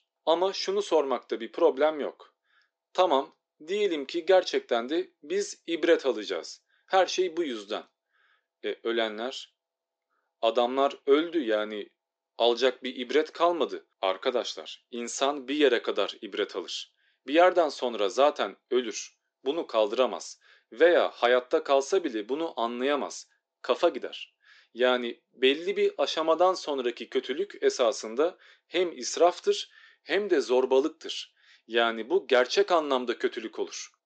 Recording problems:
thin; somewhat; fading below 300 Hz
high frequencies cut off; noticeable; nothing above 8 kHz

